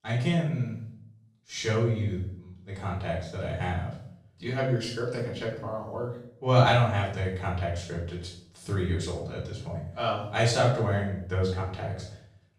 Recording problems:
off-mic speech; far
room echo; noticeable; dies away in 0.5 s

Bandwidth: 14.5 kHz